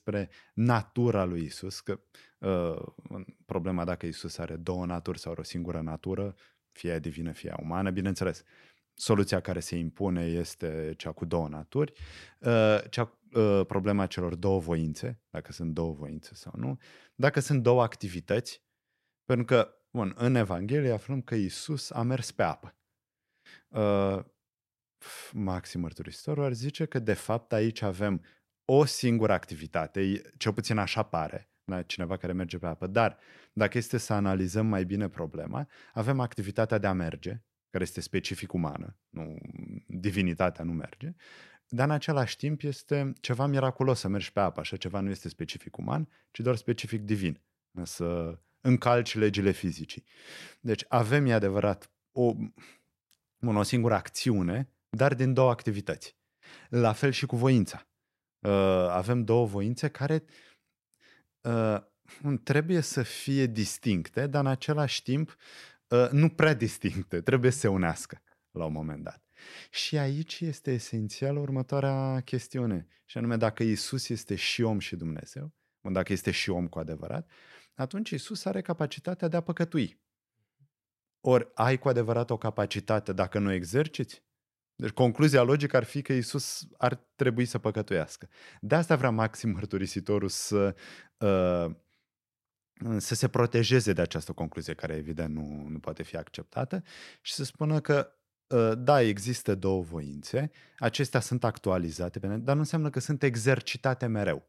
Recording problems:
none

